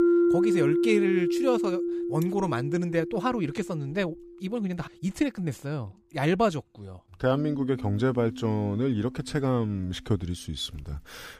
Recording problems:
background music; very loud; throughout; as loud as the speech

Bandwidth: 15 kHz